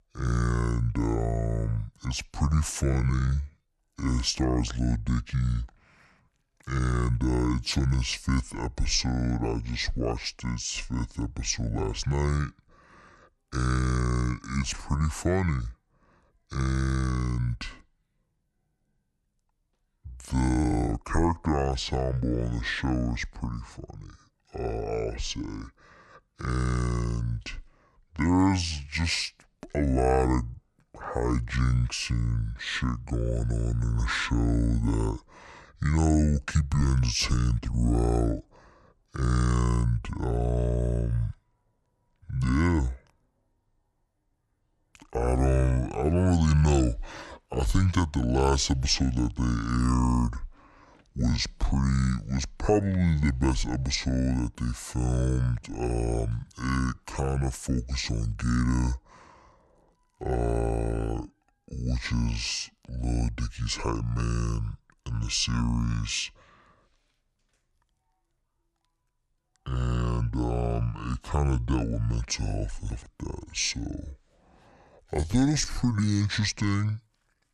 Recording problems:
wrong speed and pitch; too slow and too low; 0.6 times normal speed
uneven, jittery; strongly; from 3 s to 1:16

